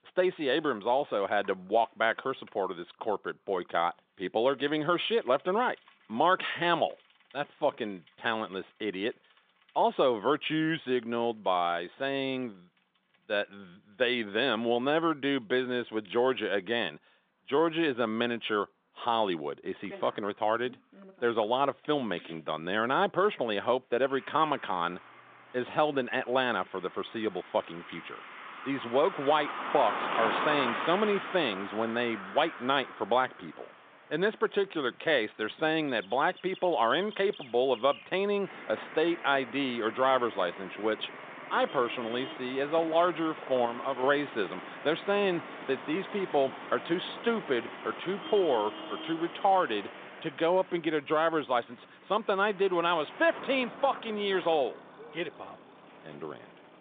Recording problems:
phone-call audio; nothing above 3.5 kHz
traffic noise; noticeable; throughout; 10 dB below the speech

